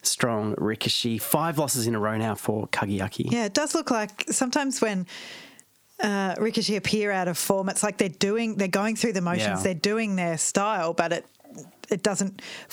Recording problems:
squashed, flat; heavily

